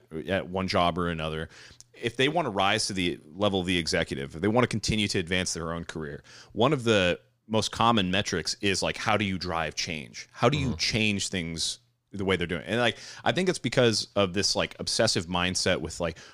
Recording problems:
none

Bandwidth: 15 kHz